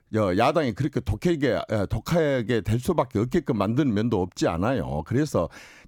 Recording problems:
none

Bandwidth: 17.5 kHz